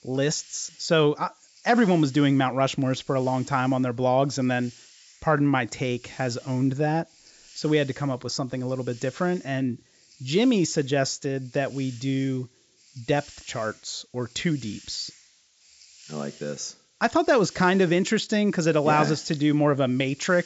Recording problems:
high frequencies cut off; noticeable; nothing above 8 kHz
hiss; faint; throughout; 25 dB below the speech

